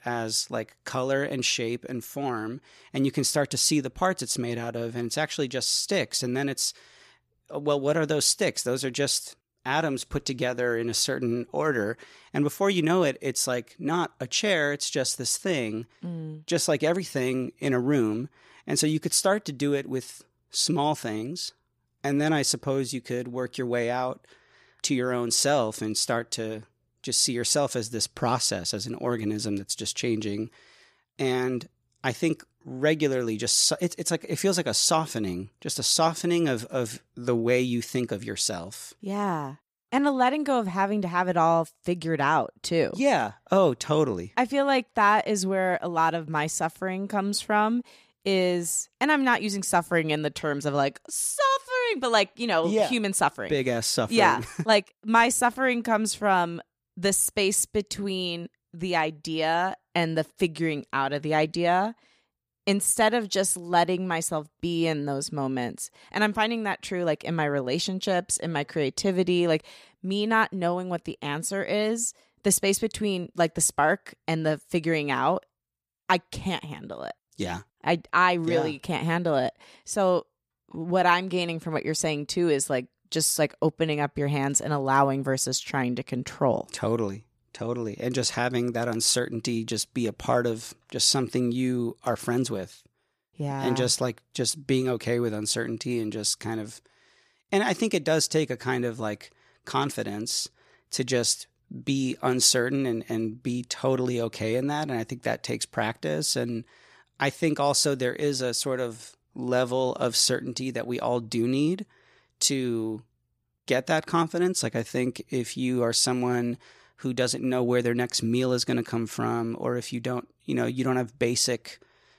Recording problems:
none

